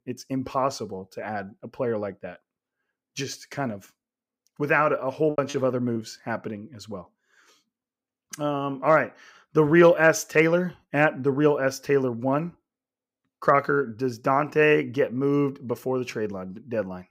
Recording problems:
choppy; very; at 5.5 s; 6% of the speech affected

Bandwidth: 15.5 kHz